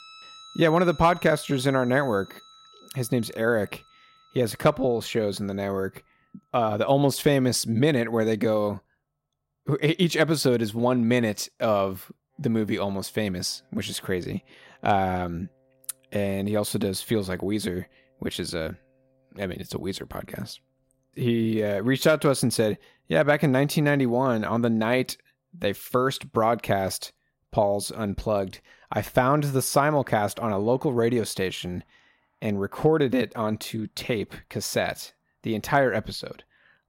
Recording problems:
background music; faint; throughout; 25 dB below the speech

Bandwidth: 16 kHz